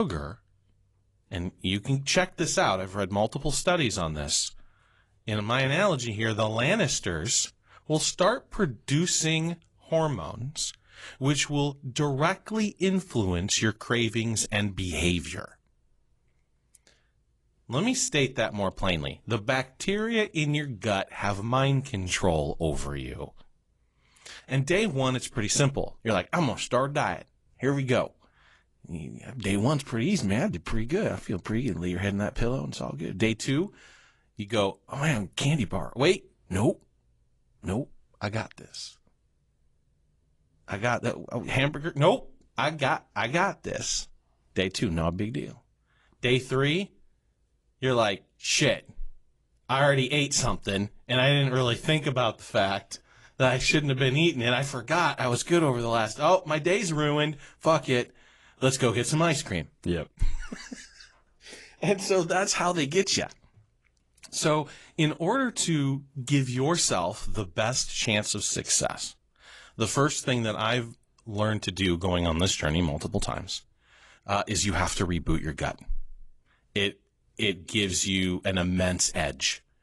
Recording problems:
garbled, watery; slightly; nothing above 11 kHz
abrupt cut into speech; at the start

